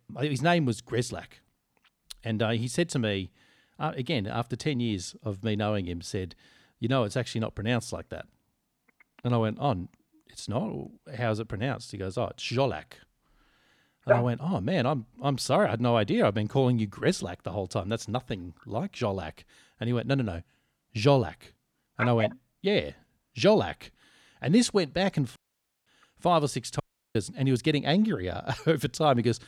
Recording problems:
audio cutting out; at 25 s for 0.5 s and at 27 s

